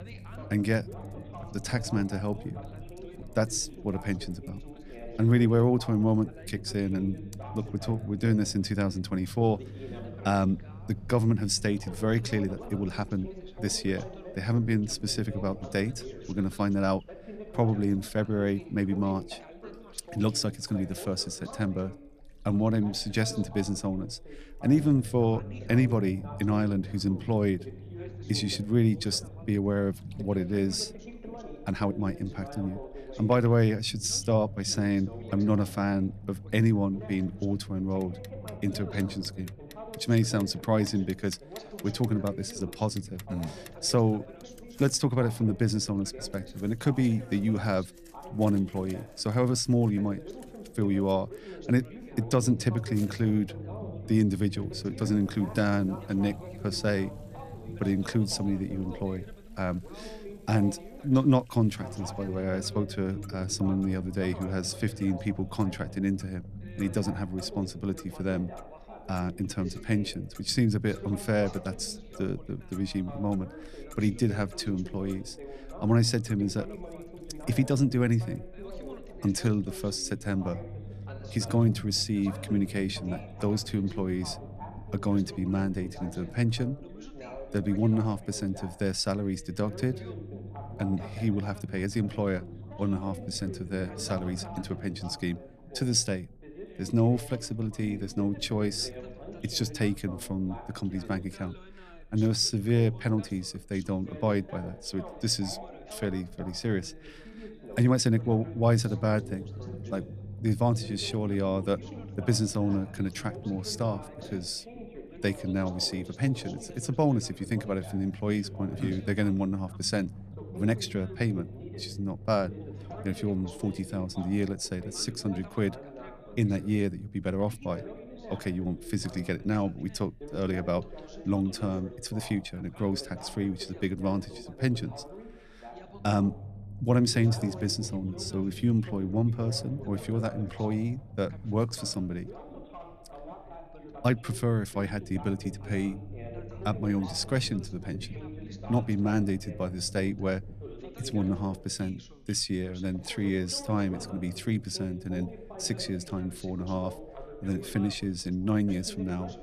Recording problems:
background chatter; noticeable; throughout; 2 voices, 15 dB below the speech
household noises; faint; until 1:19; 25 dB below the speech
low rumble; faint; throughout; 25 dB below the speech
uneven, jittery; strongly; from 12 s to 2:25

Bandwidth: 14.5 kHz